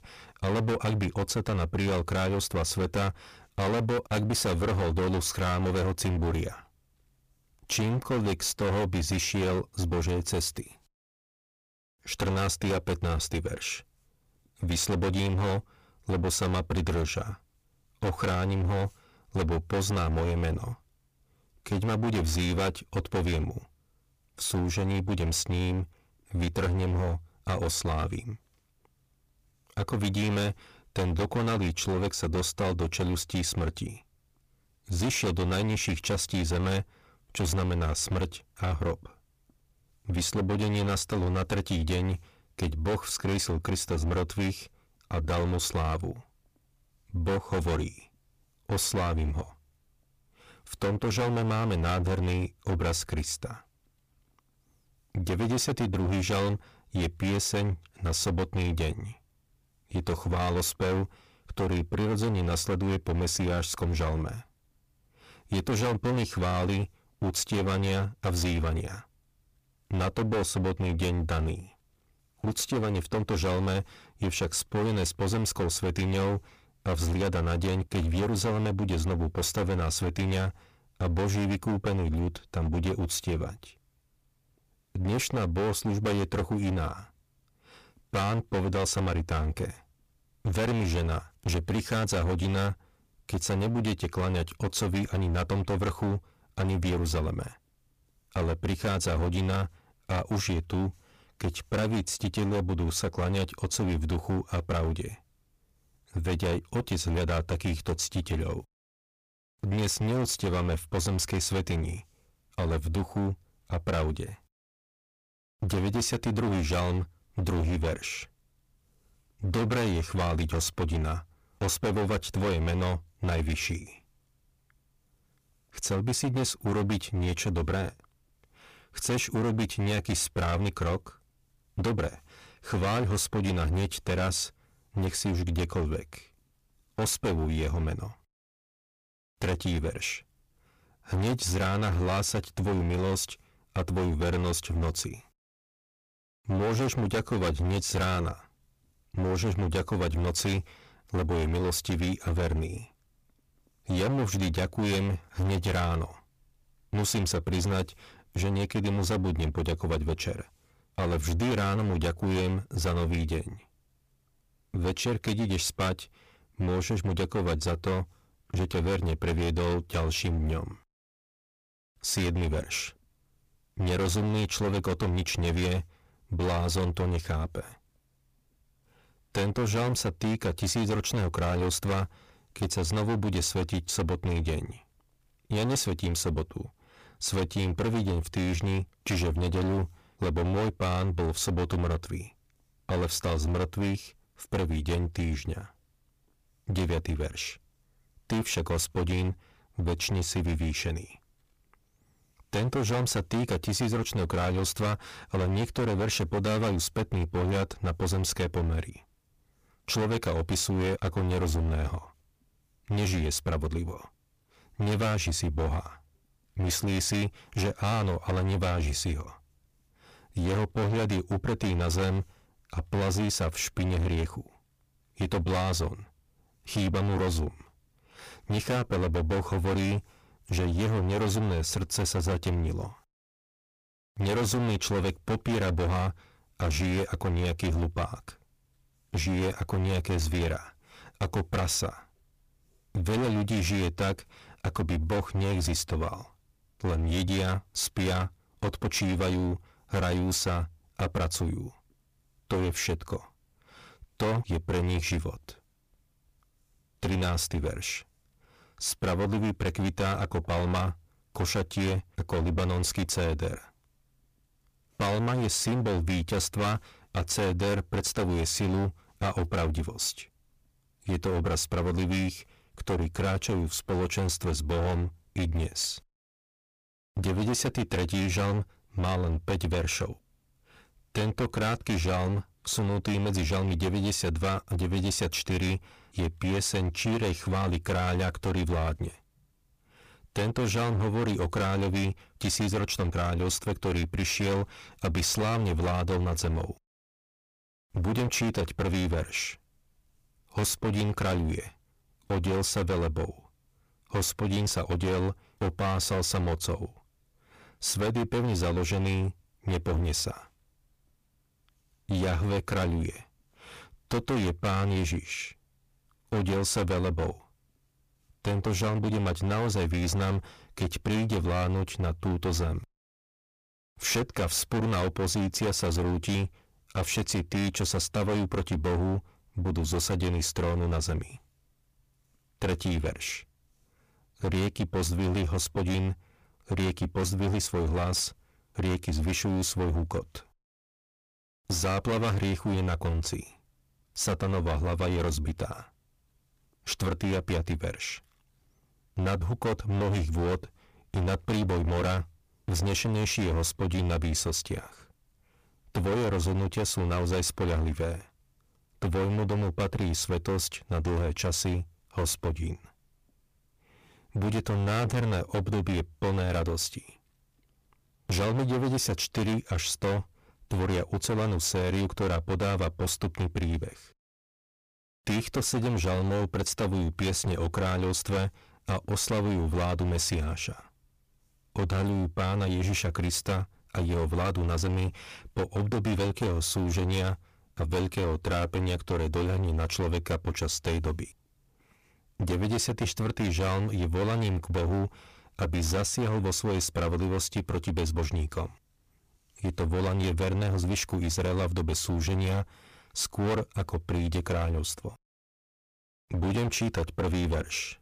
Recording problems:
distortion; heavy; 22% of the sound clipped

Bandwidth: 15 kHz